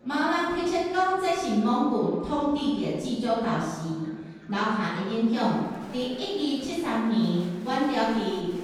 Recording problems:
room echo; strong; dies away in 1.2 s
off-mic speech; far
murmuring crowd; faint; throughout; 20 dB below the speech

